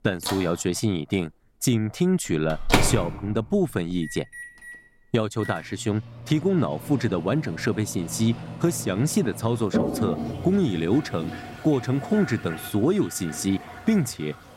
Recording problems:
household noises; loud; throughout; 7 dB below the speech

